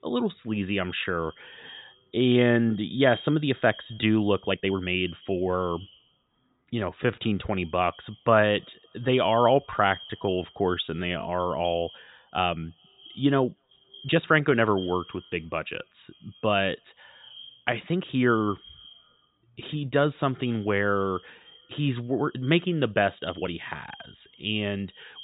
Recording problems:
high frequencies cut off; severe; nothing above 4 kHz
echo of what is said; faint; throughout; 240 ms later, 20 dB below the speech
uneven, jittery; strongly; from 2 to 24 s

